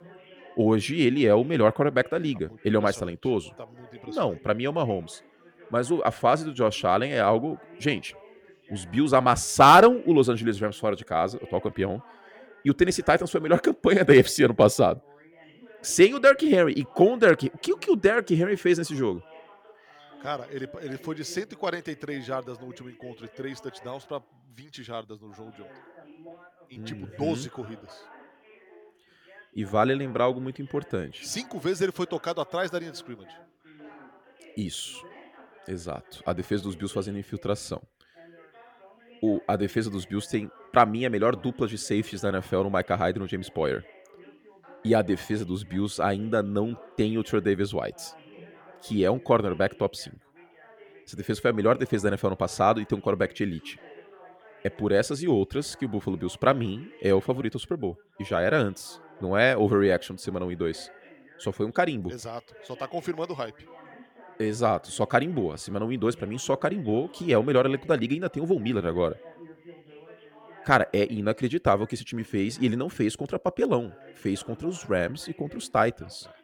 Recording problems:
background chatter; faint; throughout; 2 voices, 25 dB below the speech

